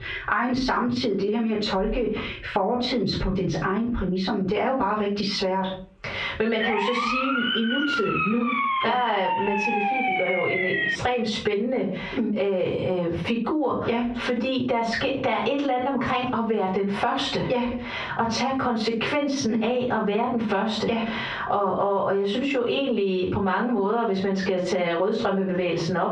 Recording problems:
off-mic speech; far
squashed, flat; heavily
muffled; slightly; fading above 3.5 kHz
room echo; slight; dies away in 0.3 s
siren; loud; from 6.5 to 11 s; peak 2 dB above the speech

